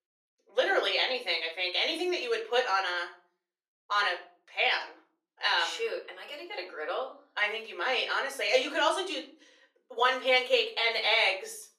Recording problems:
off-mic speech; far
thin; very; fading below 350 Hz
room echo; very slight; dies away in 0.4 s

